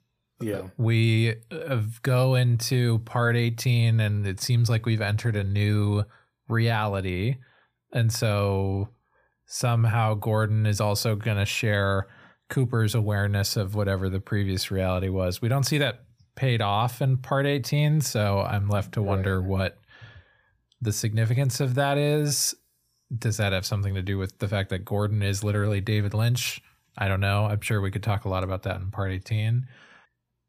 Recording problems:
none

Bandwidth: 15 kHz